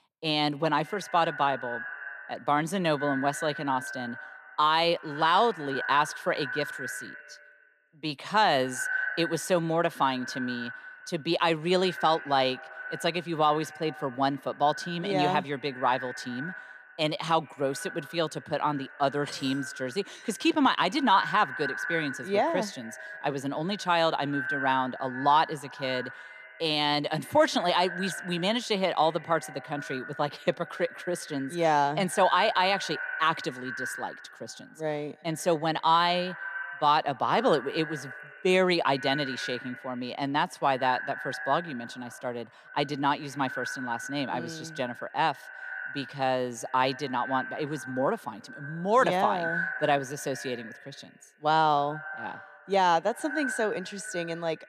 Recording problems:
echo of what is said; strong; throughout; 130 ms later, 10 dB below the speech

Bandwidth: 14.5 kHz